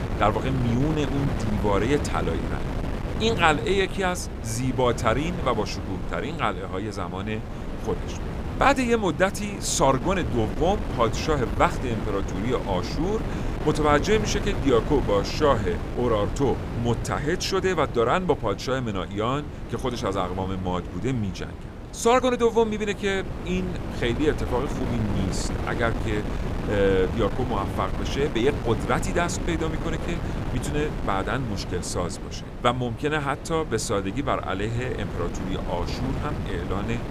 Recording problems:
wind noise on the microphone; occasional gusts; 10 dB below the speech

